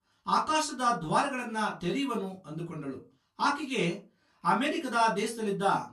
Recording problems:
off-mic speech; far
room echo; very slight; dies away in 0.2 s

